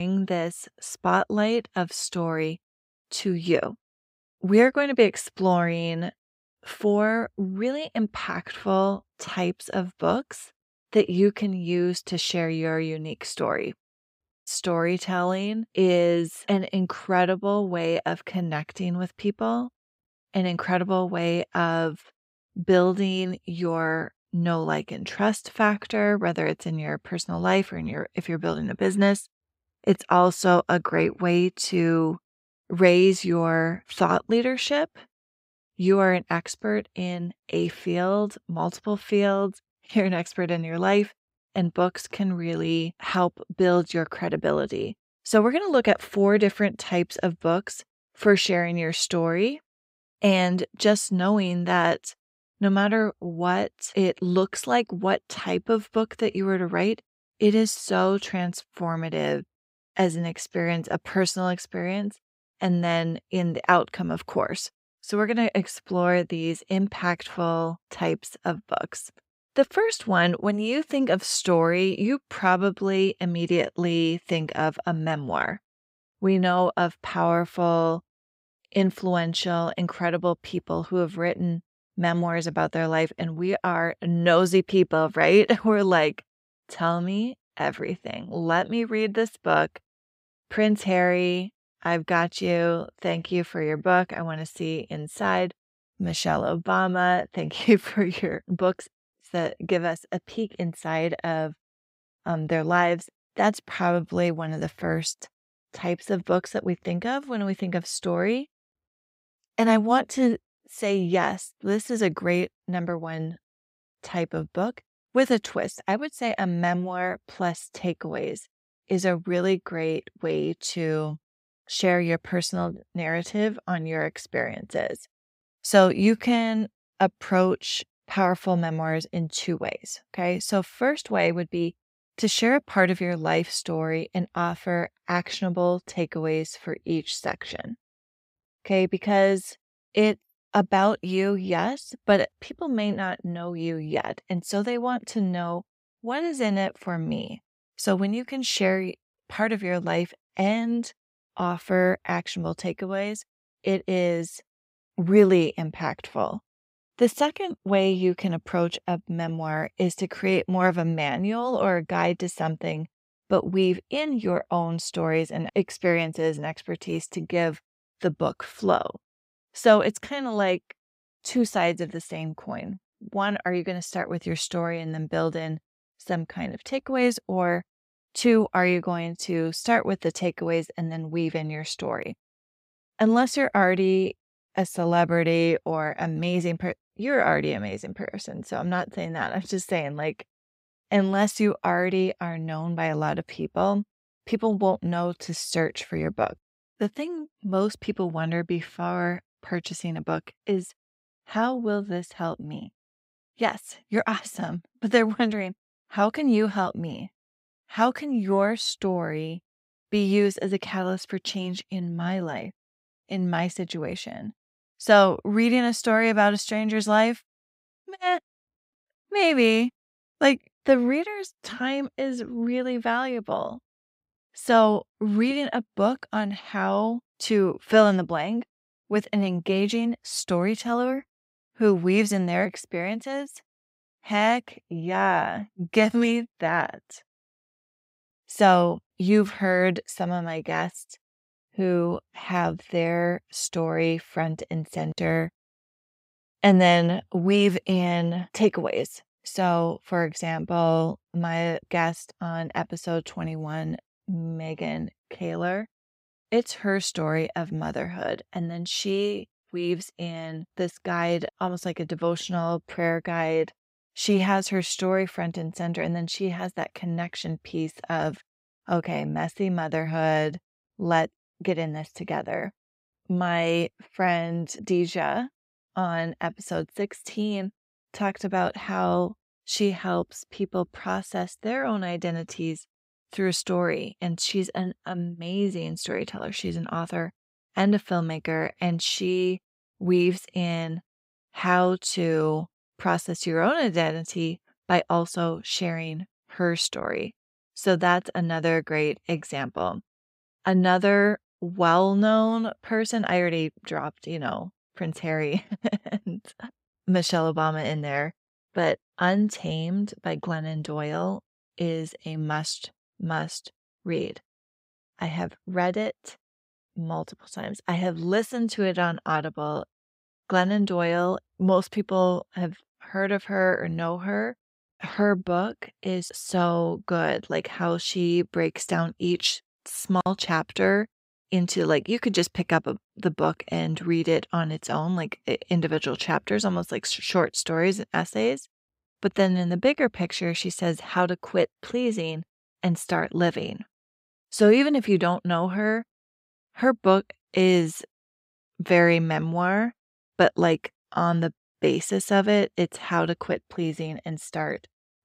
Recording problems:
abrupt cut into speech; at the start

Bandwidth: 15.5 kHz